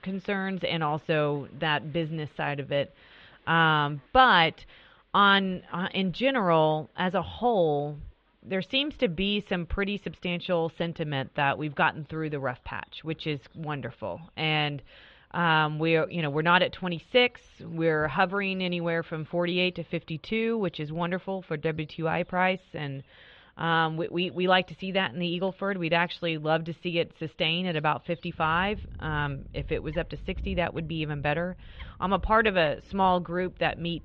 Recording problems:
muffled; very; fading above 3.5 kHz
animal sounds; faint; throughout; 20 dB below the speech

